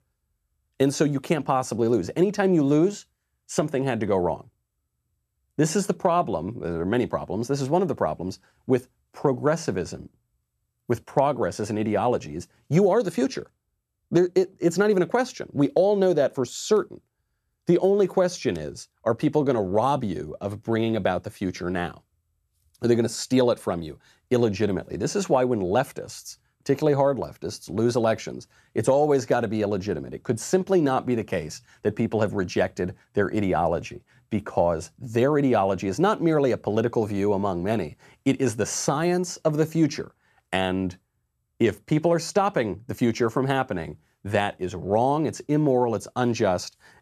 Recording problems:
none

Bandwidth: 14 kHz